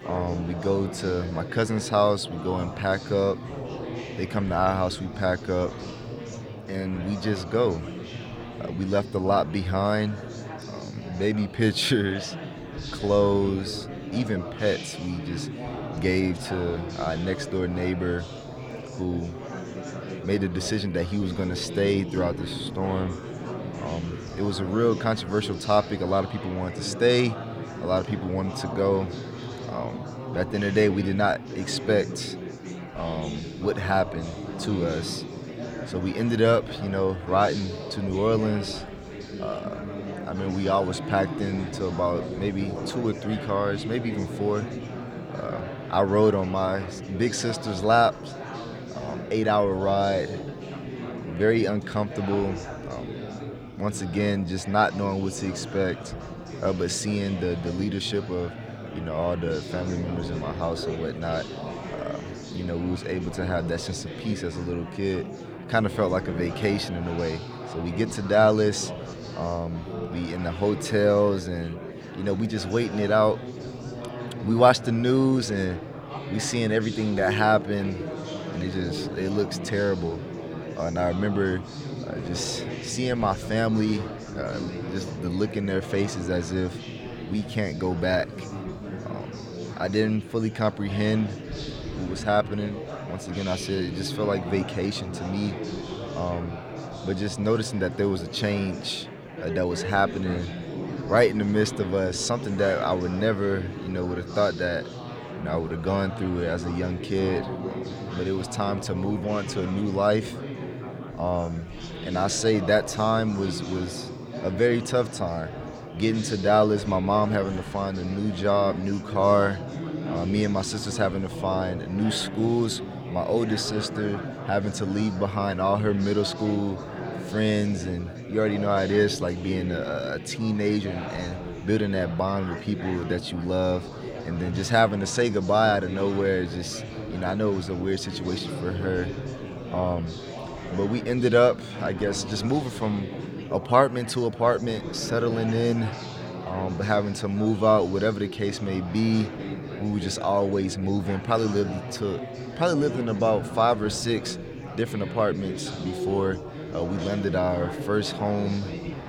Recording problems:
chatter from many people; loud; throughout; 9 dB below the speech

